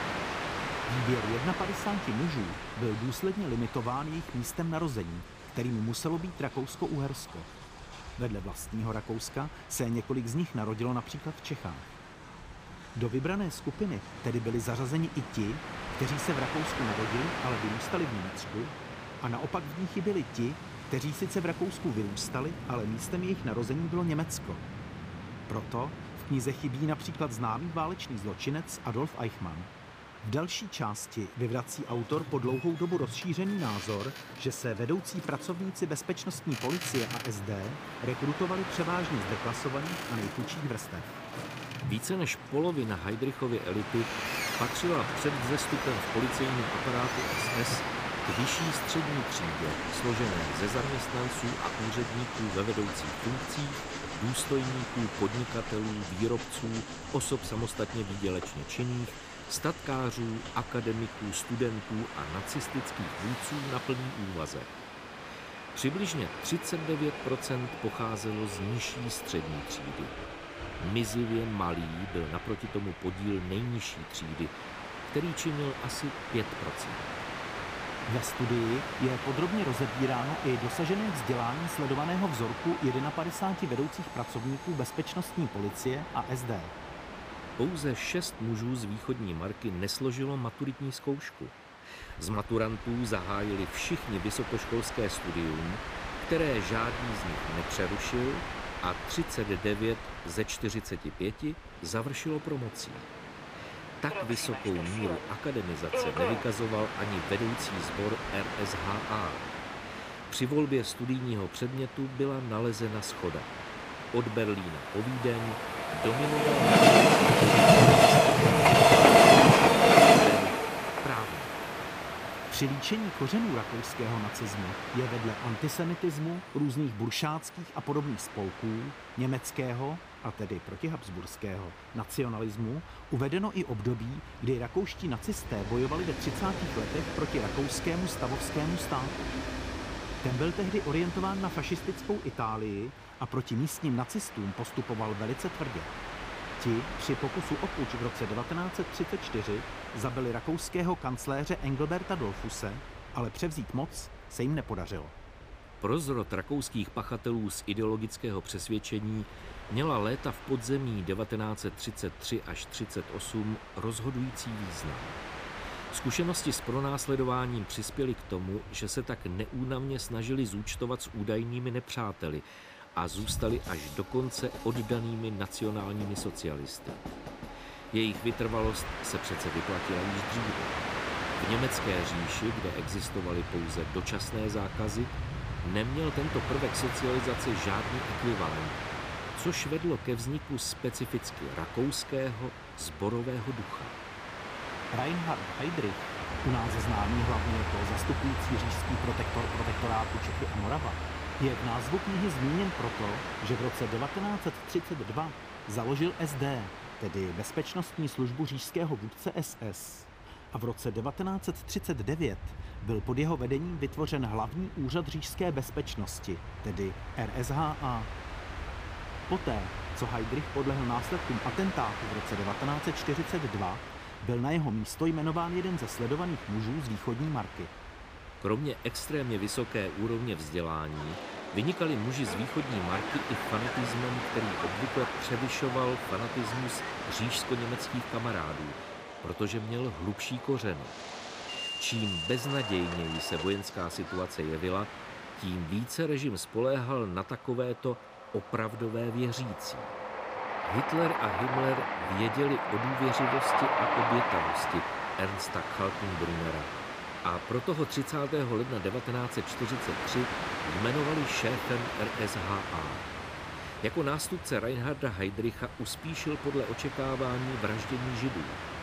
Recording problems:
train or aircraft noise; very loud; throughout; 1 dB above the speech

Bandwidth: 15 kHz